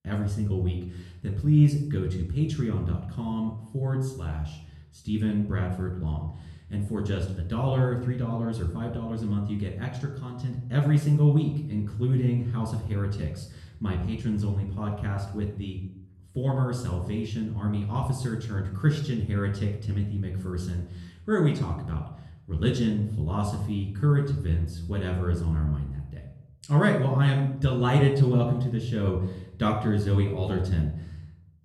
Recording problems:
off-mic speech; far
room echo; noticeable; dies away in 0.6 s

